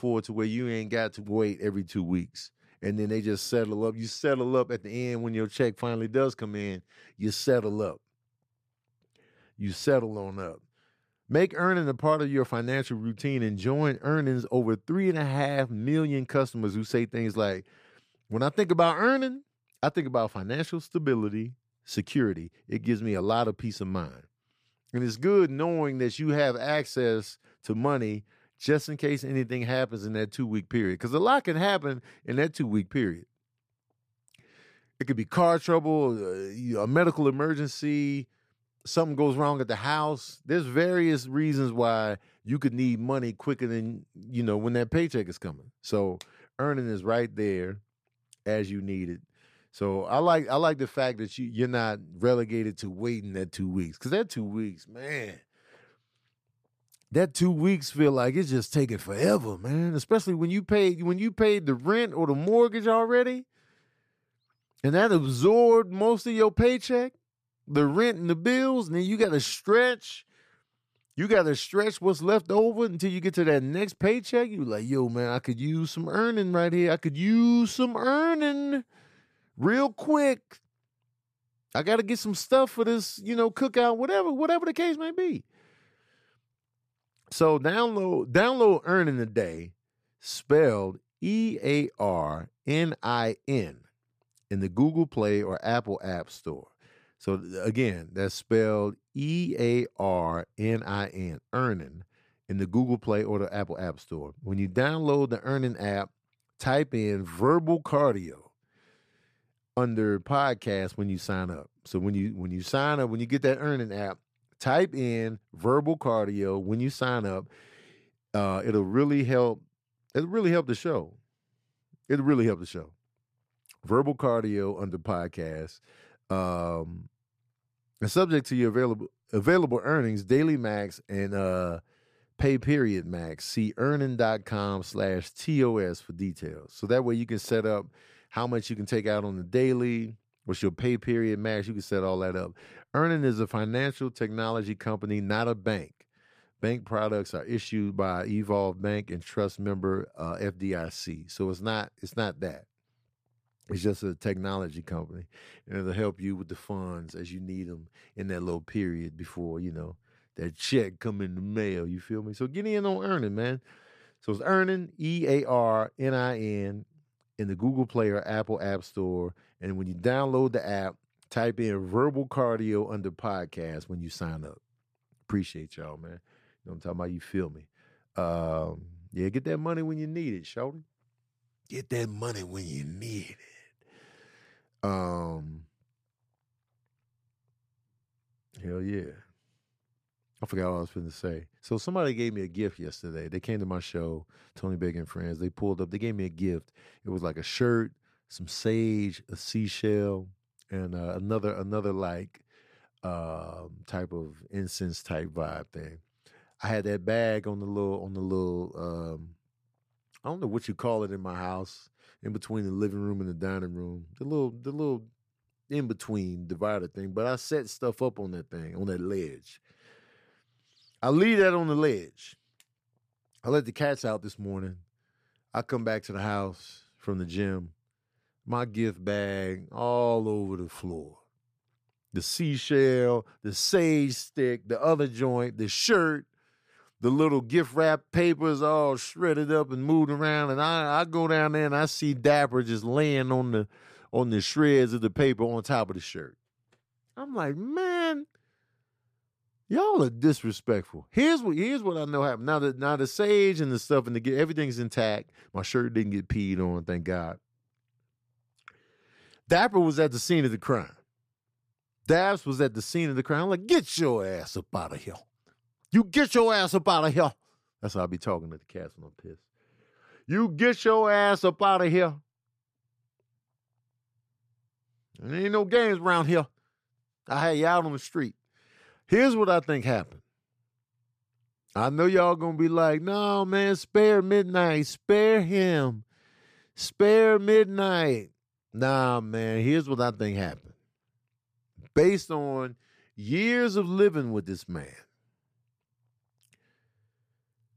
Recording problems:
none

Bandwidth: 15 kHz